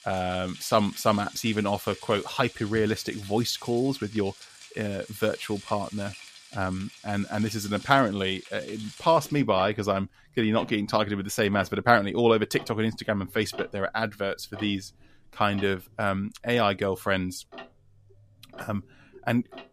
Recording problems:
household noises; noticeable; throughout; 20 dB below the speech

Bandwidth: 14.5 kHz